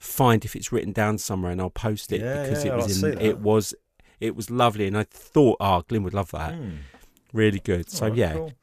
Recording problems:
none

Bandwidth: 14.5 kHz